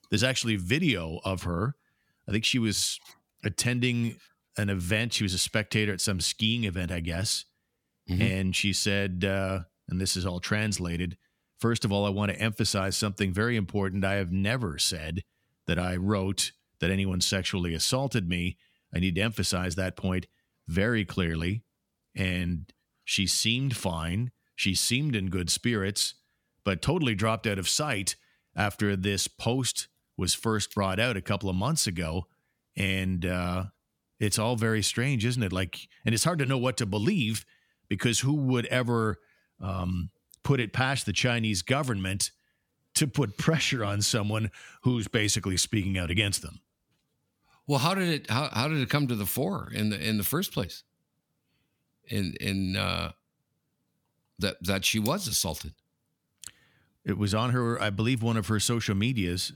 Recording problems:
none

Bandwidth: 18.5 kHz